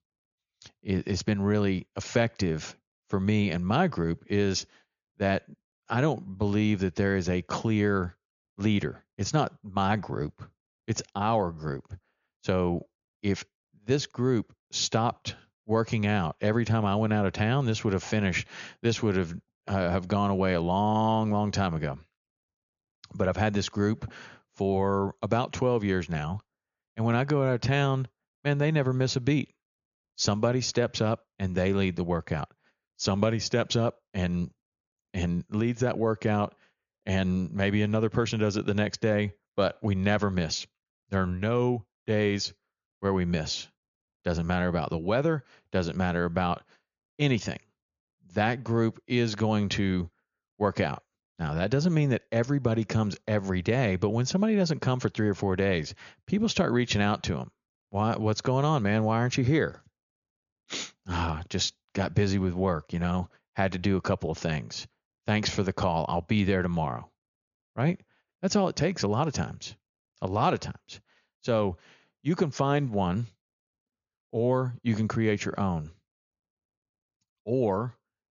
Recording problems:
high frequencies cut off; noticeable; nothing above 7 kHz

